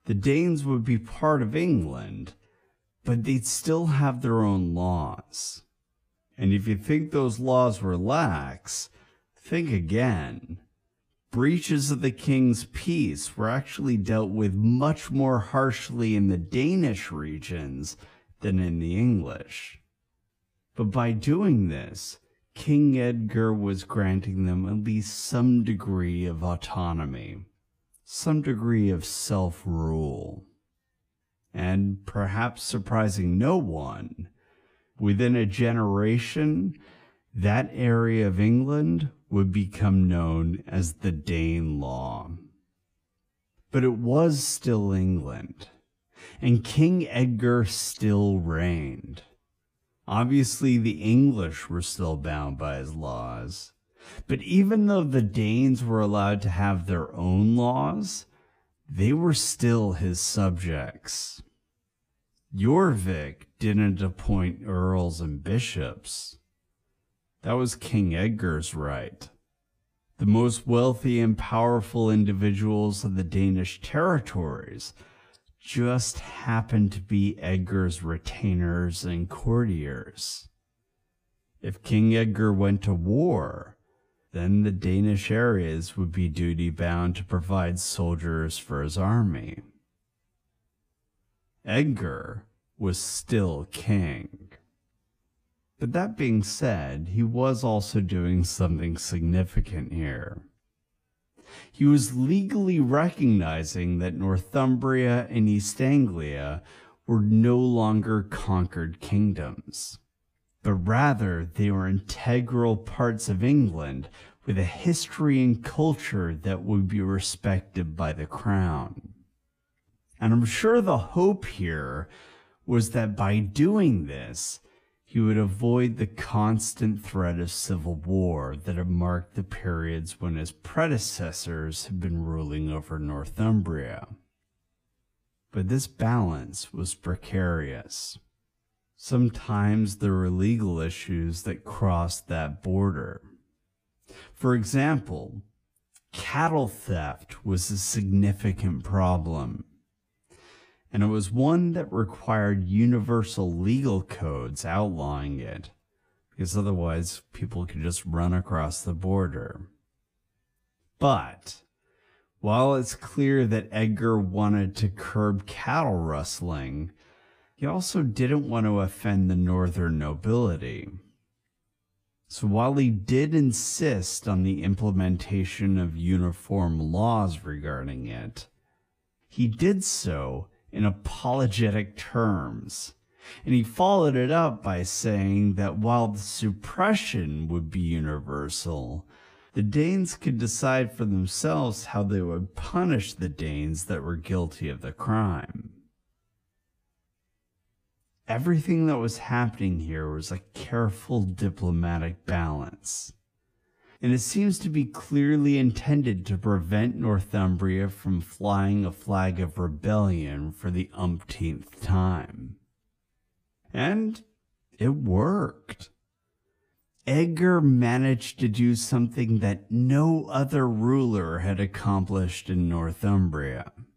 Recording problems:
wrong speed, natural pitch; too slow; 0.6 times normal speed

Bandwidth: 15 kHz